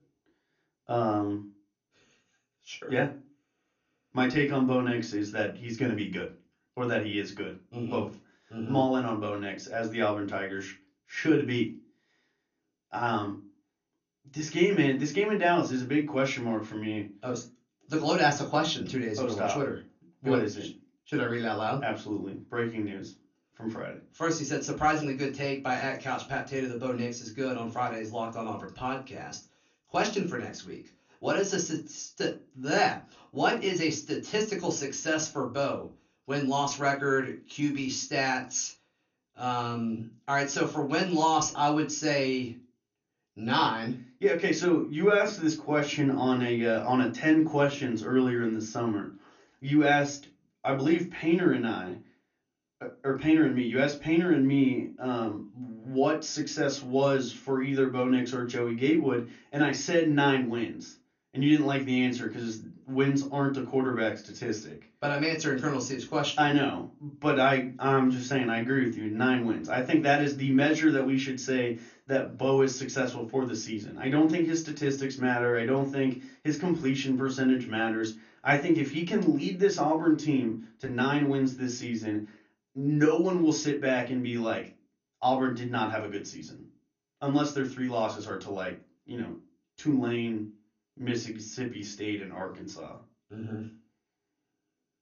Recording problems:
off-mic speech; far
room echo; very slight; dies away in 0.2 s
garbled, watery; slightly; nothing above 6.5 kHz

